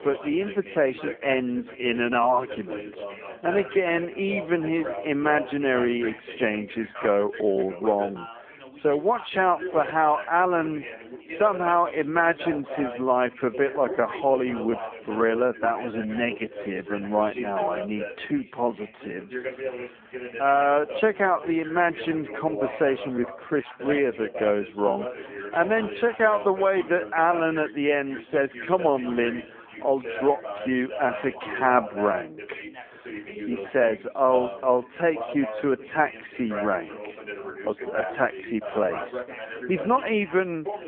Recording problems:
muffled; very; fading above 3 kHz
wrong speed, natural pitch; too slow; 0.6 times normal speed
phone-call audio
background chatter; noticeable; throughout; 2 voices, 10 dB below the speech

